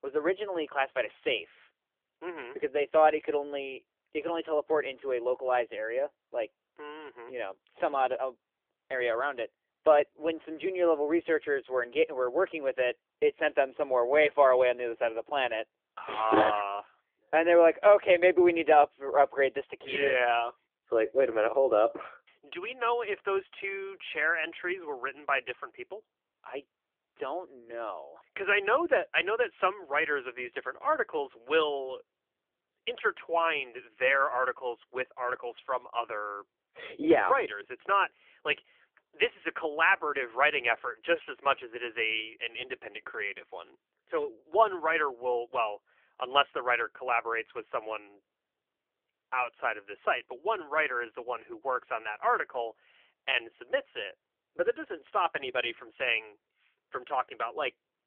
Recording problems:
phone-call audio; nothing above 3 kHz

